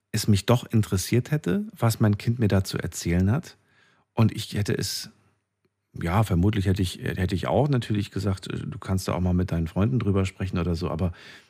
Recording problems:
none

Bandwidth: 15 kHz